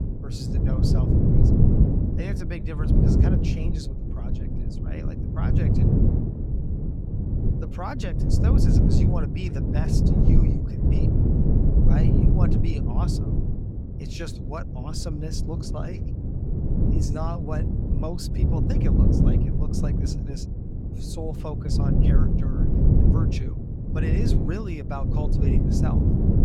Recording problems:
wind noise on the microphone; heavy; 4 dB above the speech

